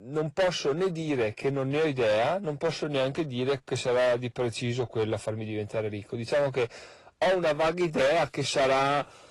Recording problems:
distortion; heavy; 14% of the sound clipped
garbled, watery; slightly; nothing above 11 kHz

